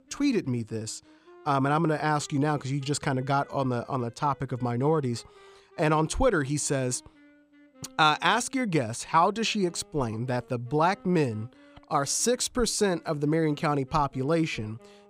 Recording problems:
background music; faint; throughout; 30 dB below the speech

